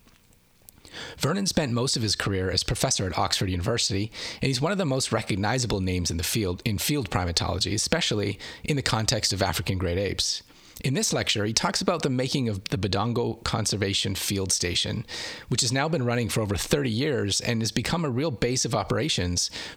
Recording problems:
squashed, flat; heavily

